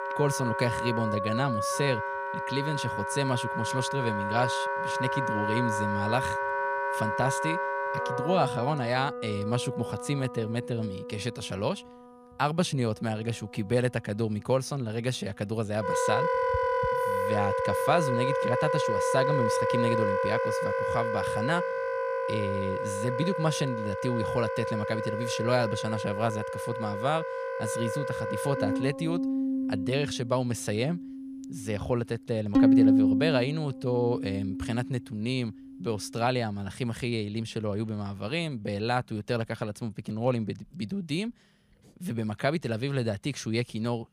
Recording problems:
background music; very loud; throughout; 1 dB above the speech

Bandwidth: 15 kHz